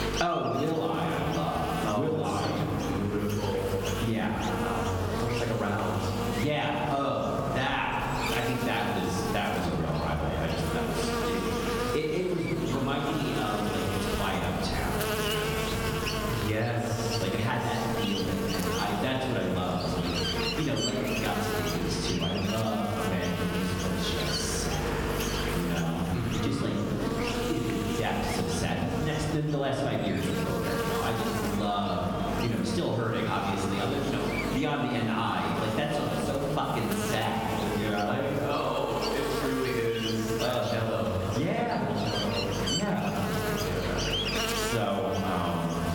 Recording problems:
off-mic speech; far
squashed, flat; heavily
room echo; noticeable; dies away in 1.8 s
electrical hum; loud; throughout; 50 Hz, 2 dB below the speech

